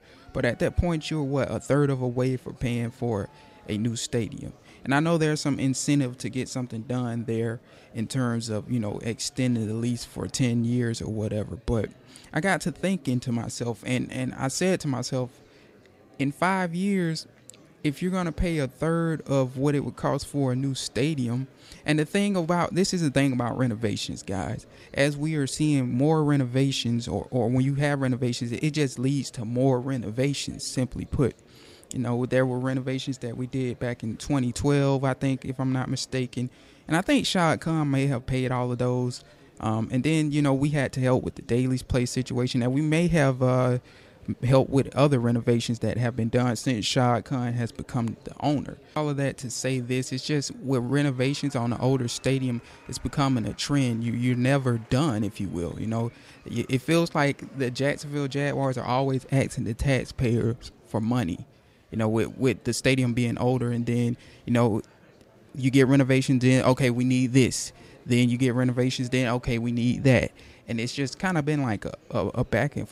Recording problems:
murmuring crowd; faint; throughout; 30 dB below the speech

